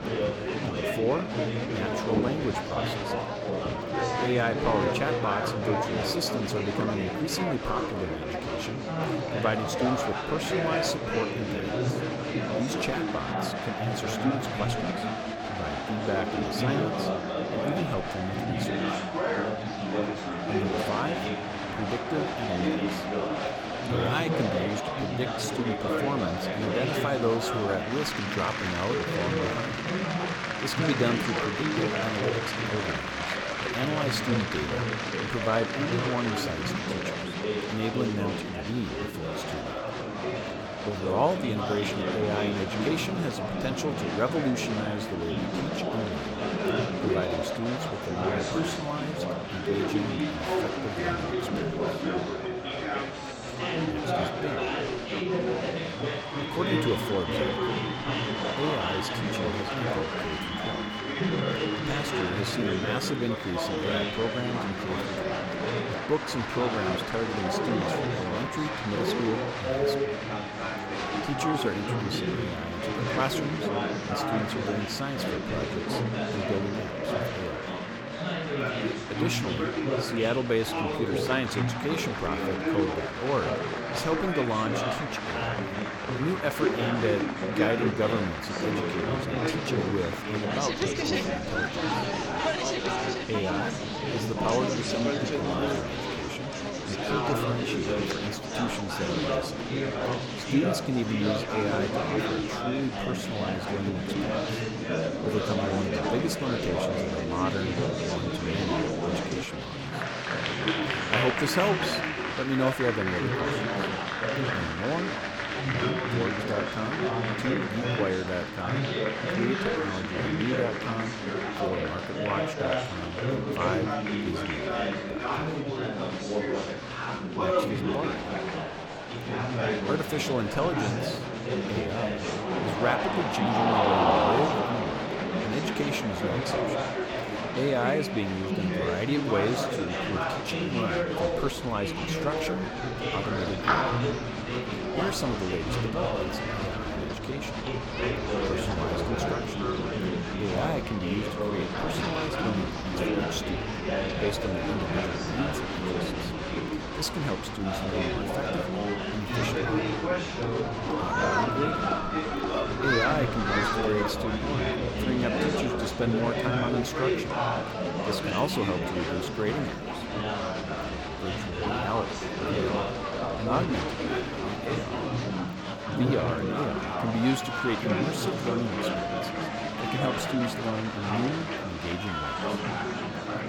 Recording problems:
chatter from many people; very loud; throughout; 3 dB above the speech

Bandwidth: 18.5 kHz